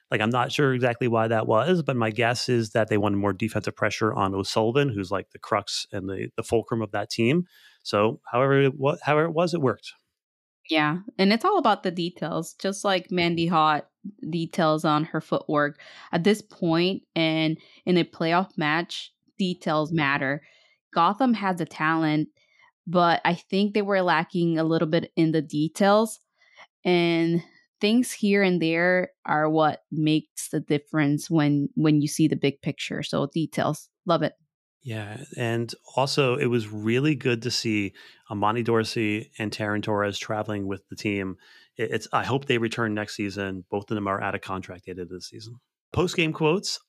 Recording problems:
none

